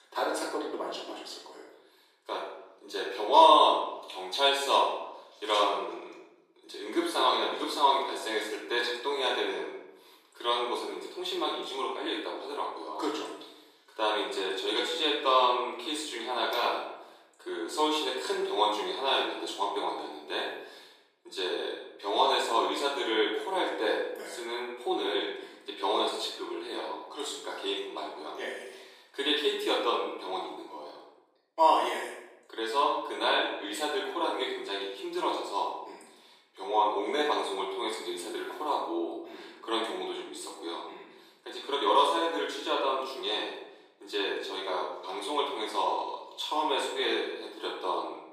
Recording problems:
off-mic speech; far
thin; very; fading below 350 Hz
room echo; noticeable; dies away in 0.8 s

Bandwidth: 15 kHz